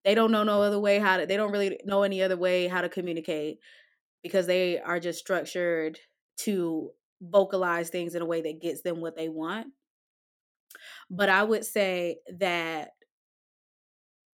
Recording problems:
none

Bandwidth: 17 kHz